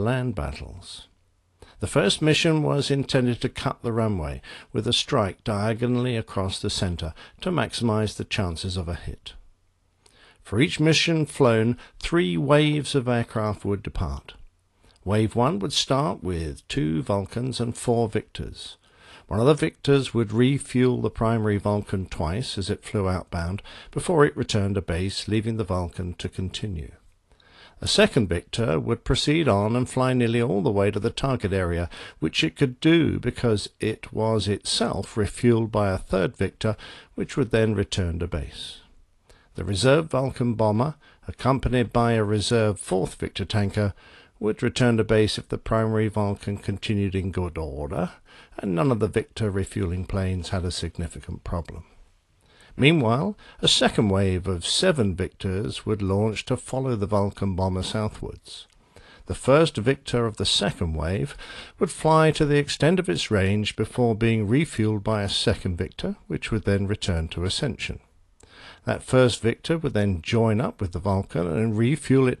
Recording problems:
garbled, watery; slightly
abrupt cut into speech; at the start

